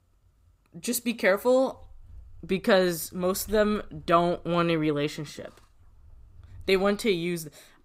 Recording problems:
none

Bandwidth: 15.5 kHz